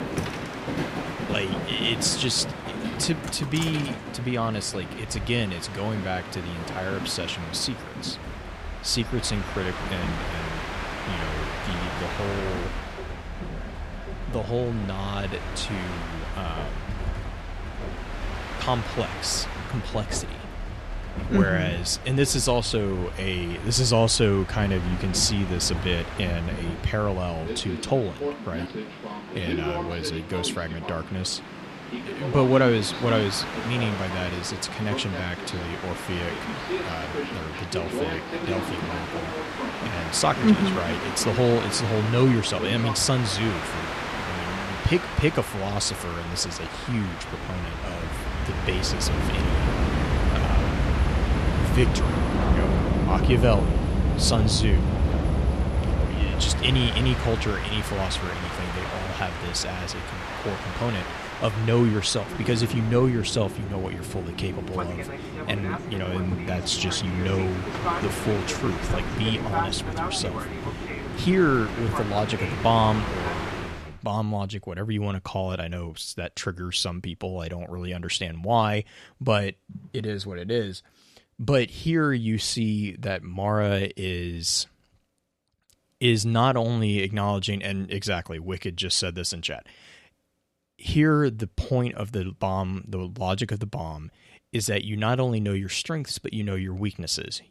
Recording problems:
train or aircraft noise; loud; until 1:14; 4 dB below the speech

